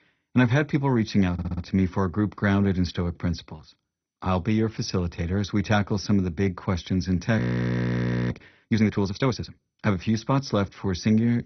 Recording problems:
garbled, watery; badly; nothing above 6 kHz
audio stuttering; at 1.5 s
audio freezing; at 7.5 s for 1 s

